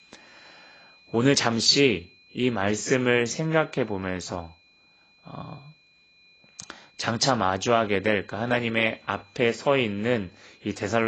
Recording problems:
garbled, watery; badly; nothing above 7.5 kHz
high-pitched whine; faint; throughout; 2.5 kHz, 30 dB below the speech
abrupt cut into speech; at the end

